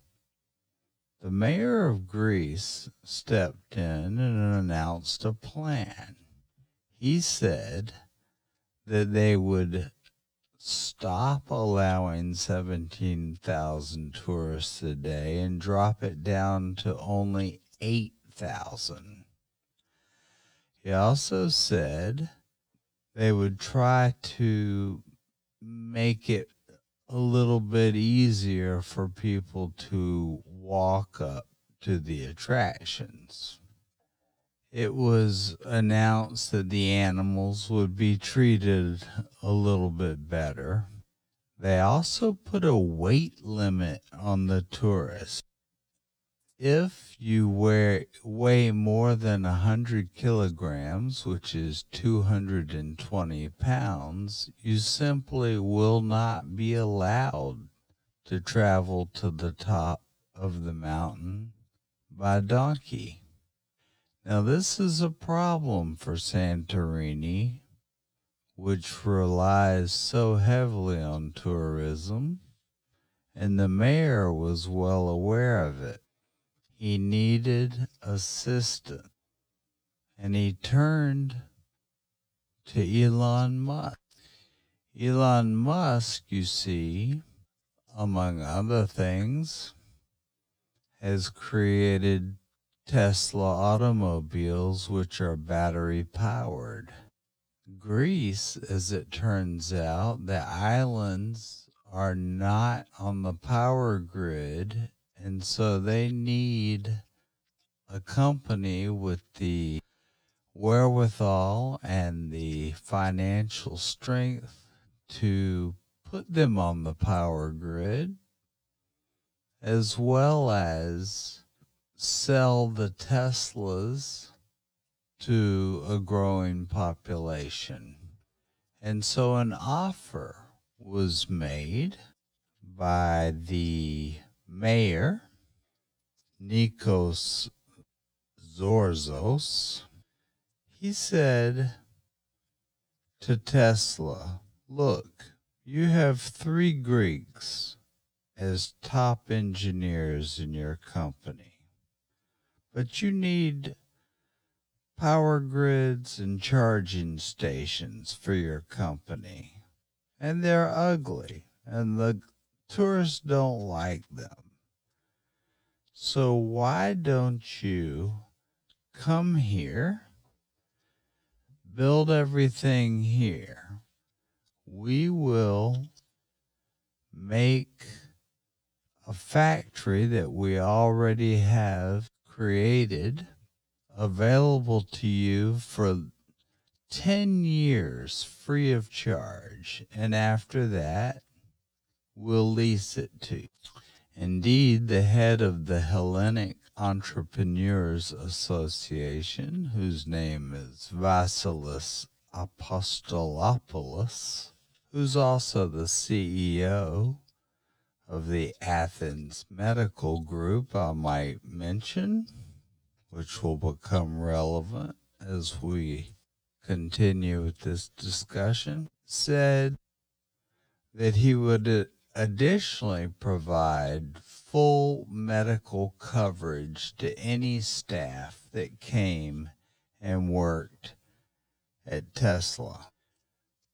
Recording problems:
wrong speed, natural pitch; too slow; 0.6 times normal speed

